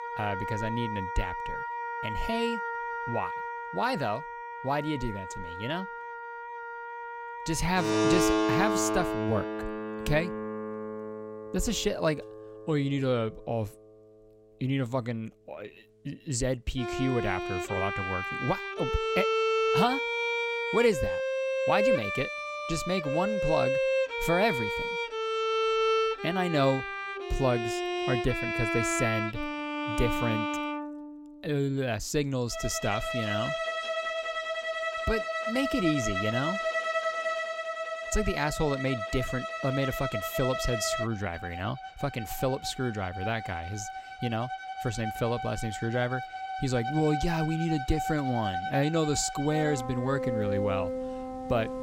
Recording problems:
background music; loud; throughout; 1 dB below the speech

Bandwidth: 16 kHz